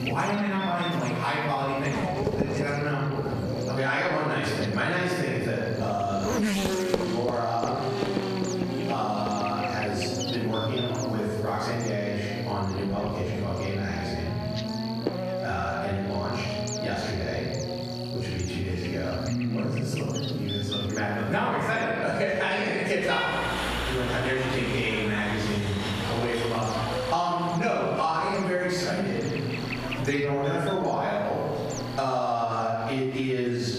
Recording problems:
room echo; strong; dies away in 1.1 s
off-mic speech; far
squashed, flat; heavily
traffic noise; loud; throughout; 5 dB below the speech
electrical hum; noticeable; throughout; 60 Hz, 10 dB below the speech

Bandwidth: 14.5 kHz